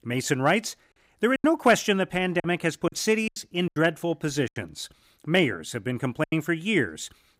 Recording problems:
choppy; very; from 1.5 to 4.5 s and at 6 s; 11% of the speech affected

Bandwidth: 15.5 kHz